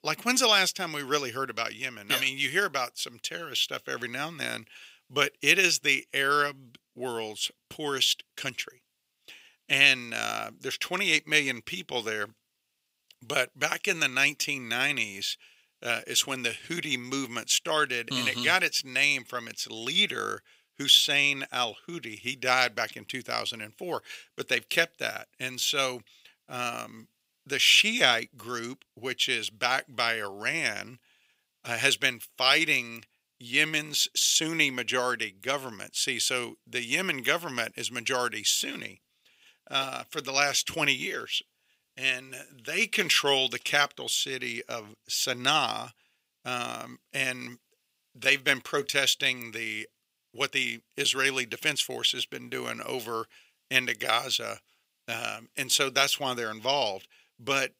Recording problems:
thin; somewhat; fading below 350 Hz

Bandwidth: 15.5 kHz